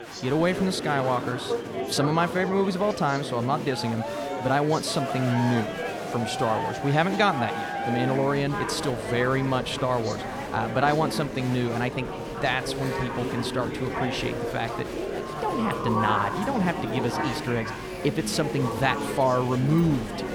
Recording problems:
chatter from many people; loud; throughout; 5 dB below the speech
dog barking; faint; from 12 to 18 s; peak 10 dB below the speech

